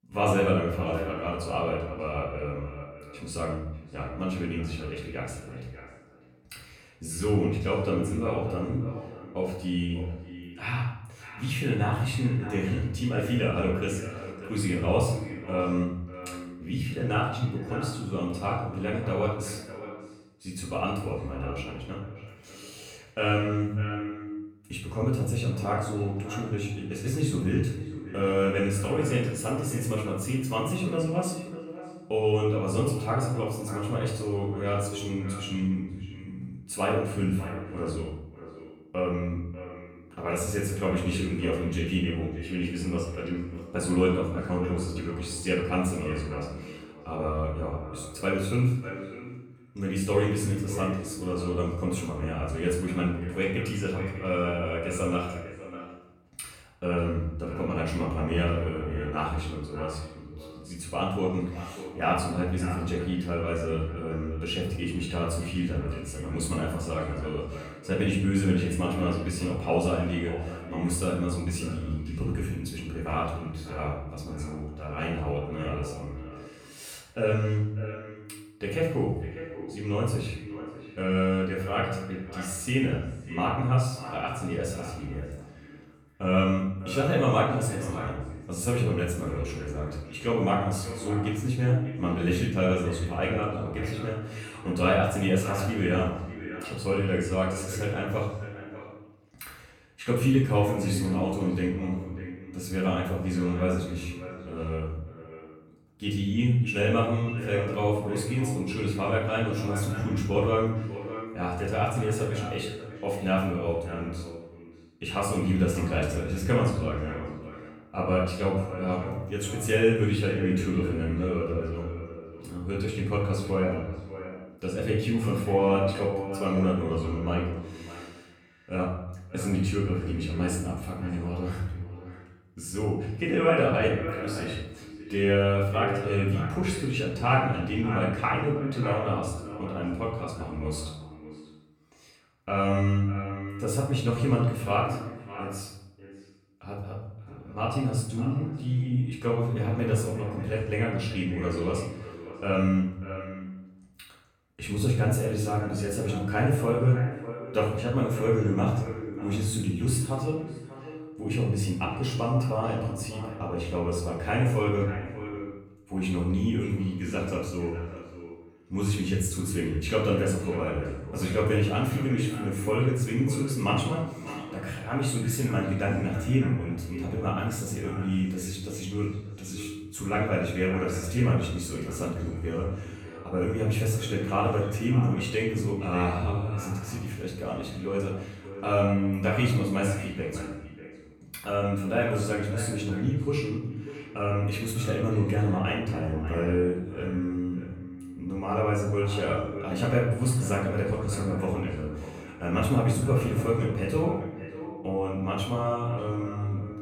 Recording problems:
off-mic speech; far
echo of what is said; noticeable; throughout; 590 ms later, 10 dB below the speech
room echo; noticeable; dies away in 0.6 s

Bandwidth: 19 kHz